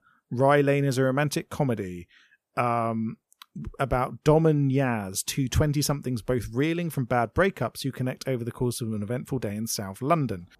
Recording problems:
none

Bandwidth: 14.5 kHz